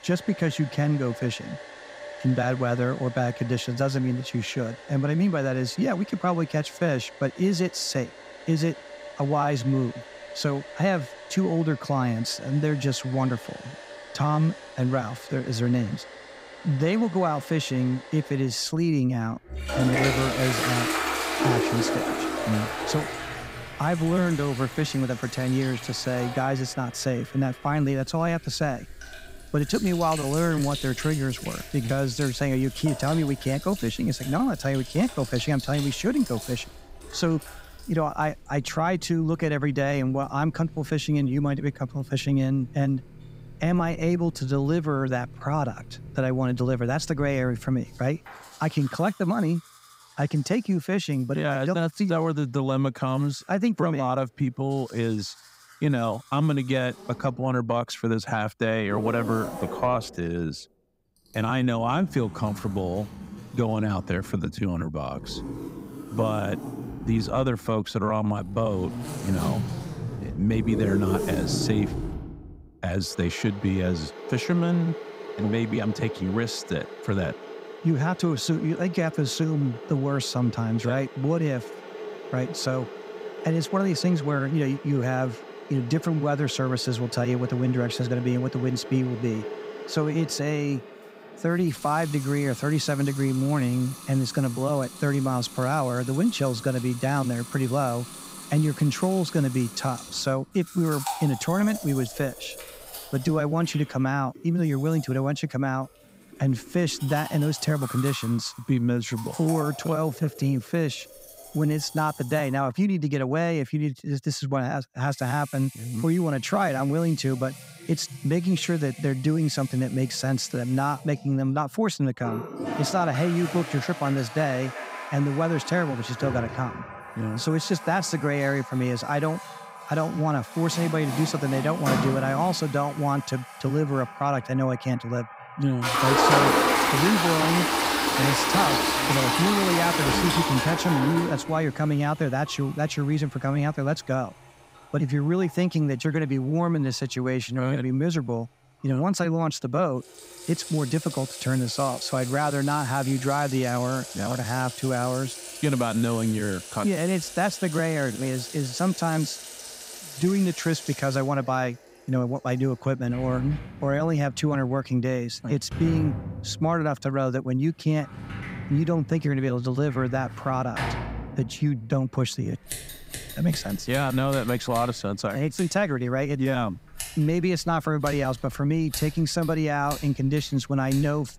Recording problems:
household noises; loud; throughout; 7 dB below the speech

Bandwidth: 15.5 kHz